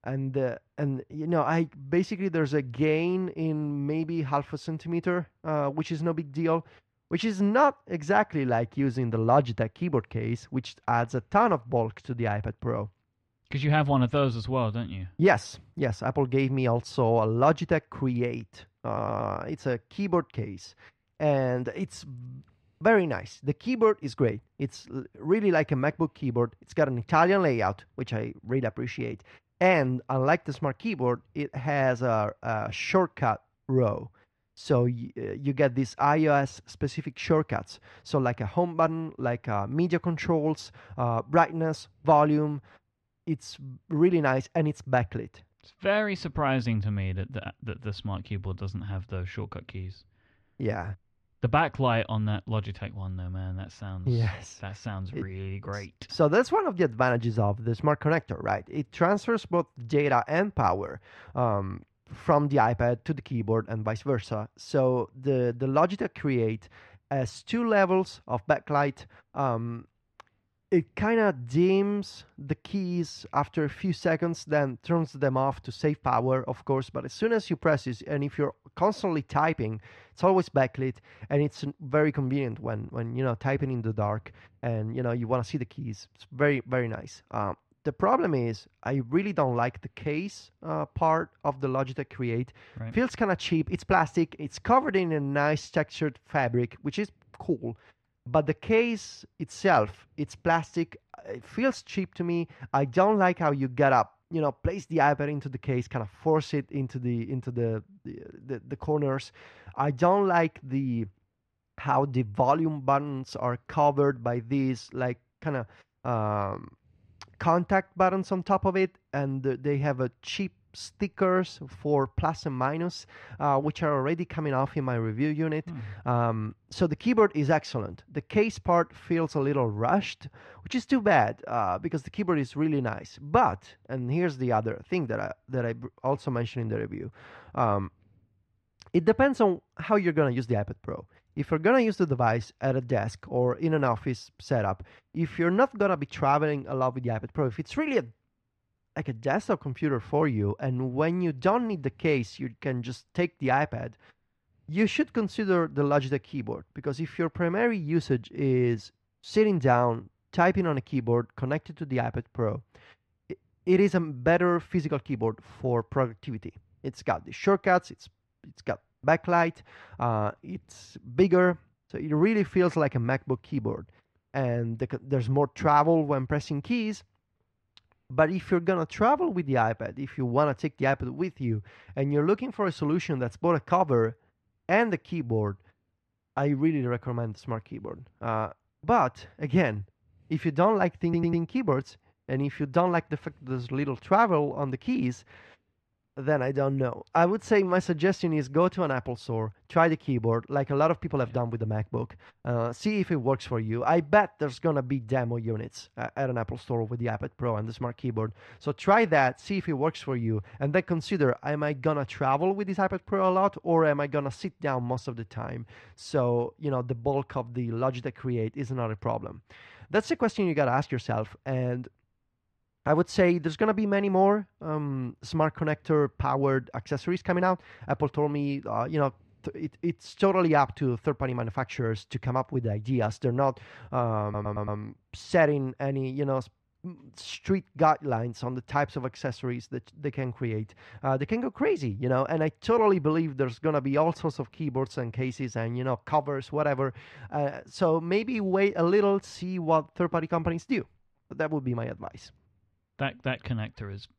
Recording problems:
muffled; very; fading above 2 kHz
audio stuttering; at 19 s, at 3:11 and at 3:54

